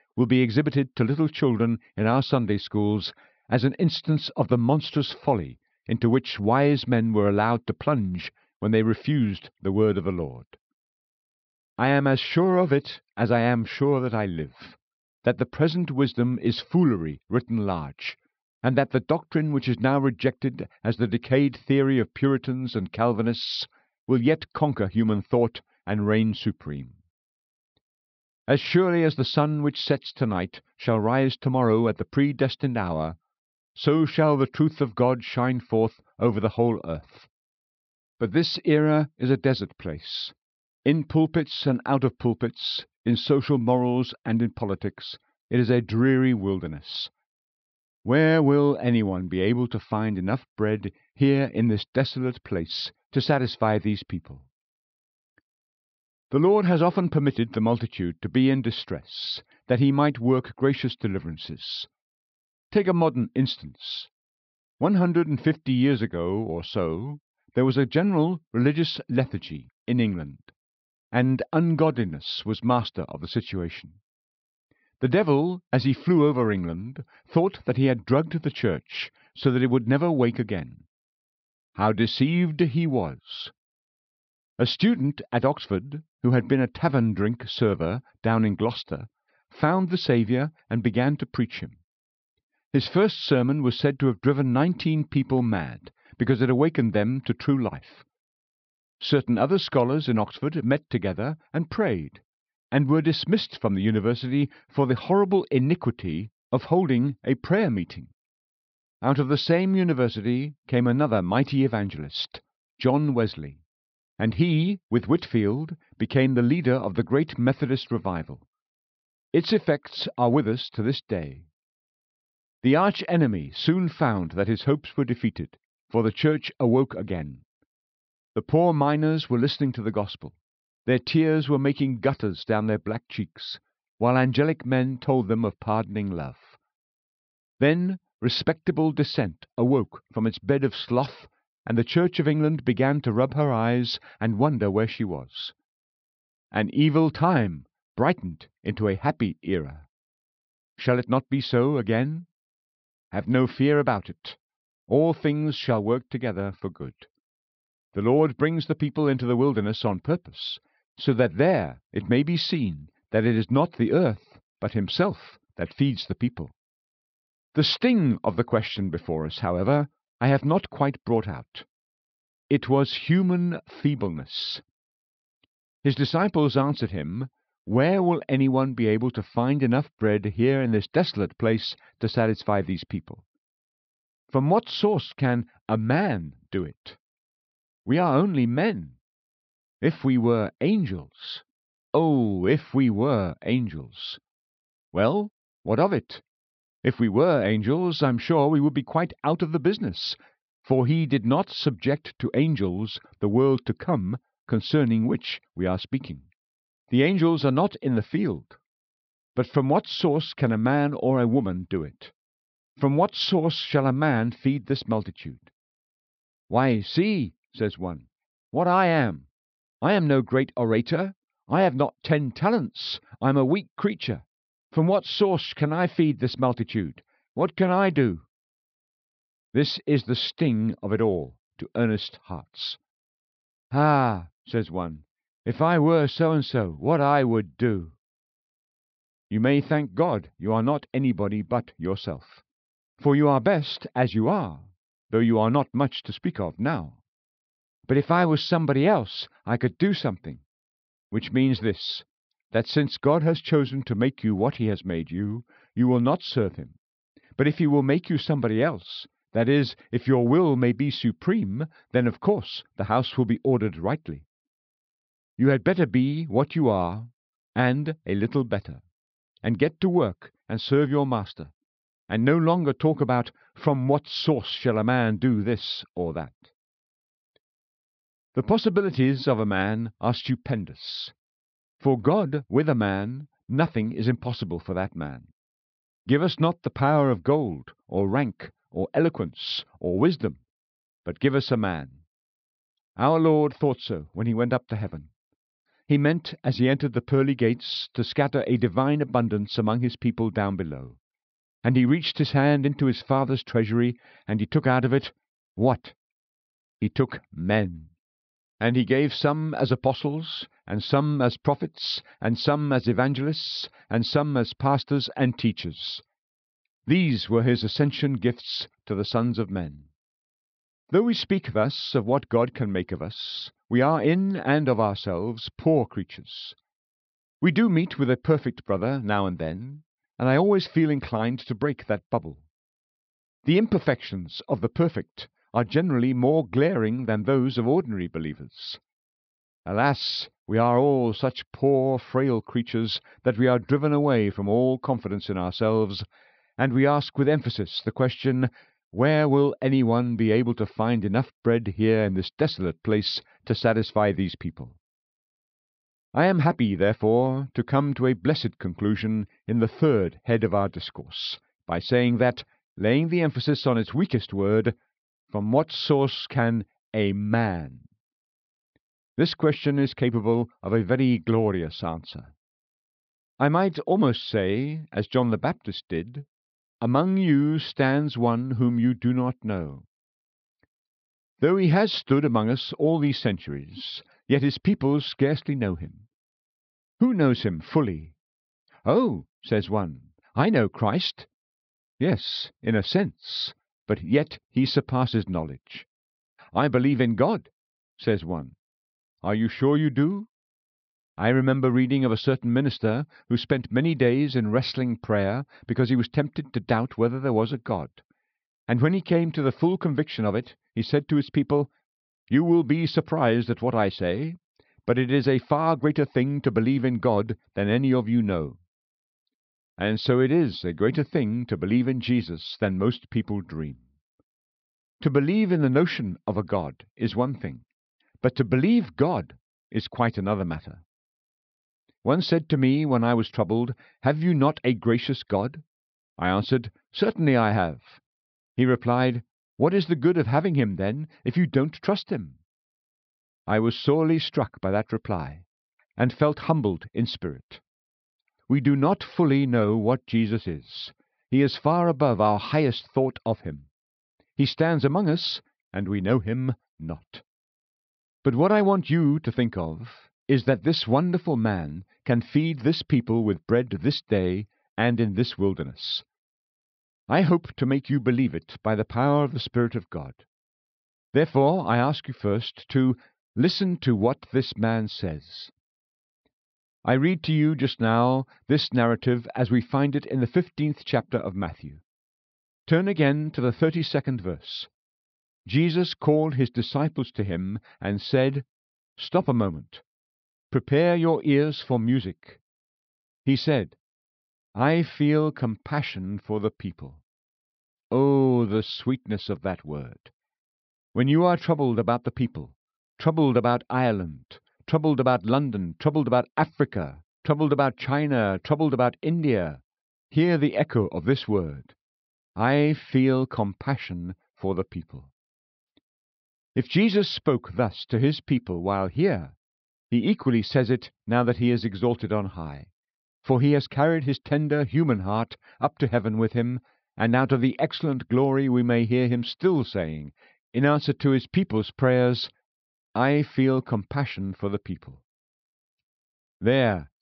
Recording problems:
high frequencies cut off; noticeable; nothing above 5.5 kHz

